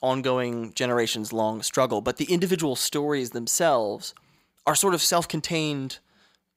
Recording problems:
none

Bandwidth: 15.5 kHz